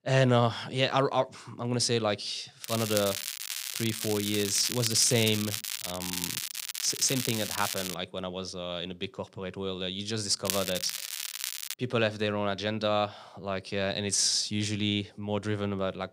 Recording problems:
crackling; loud; from 2.5 to 8 s and from 10 to 12 s; 4 dB below the speech

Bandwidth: 15.5 kHz